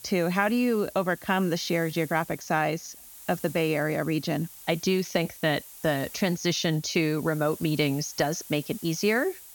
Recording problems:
high frequencies cut off; noticeable; nothing above 7 kHz
hiss; noticeable; throughout; 15 dB below the speech

